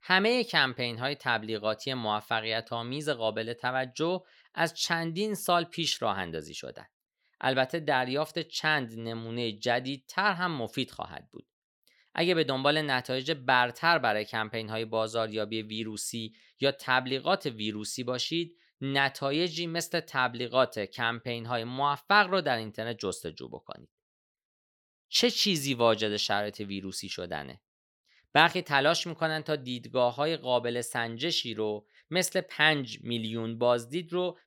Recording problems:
none

